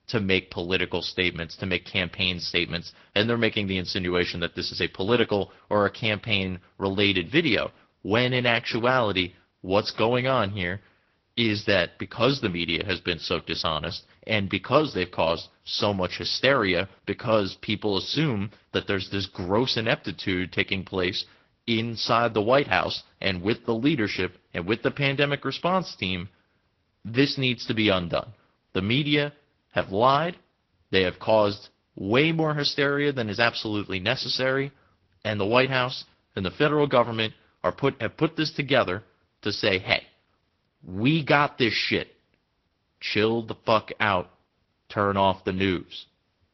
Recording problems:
high frequencies cut off; noticeable; nothing above 5.5 kHz
garbled, watery; slightly

